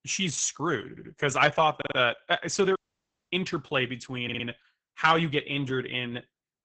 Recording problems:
garbled, watery; badly; nothing above 7.5 kHz
audio stuttering; at 1 s, at 2 s and at 4 s
audio cutting out; at 3 s for 0.5 s

